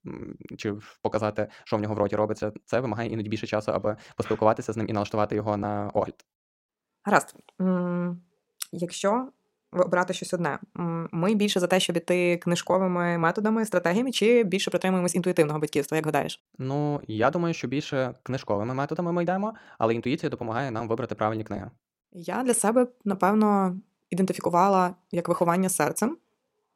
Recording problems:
wrong speed, natural pitch; too fast; 1.5 times normal speed

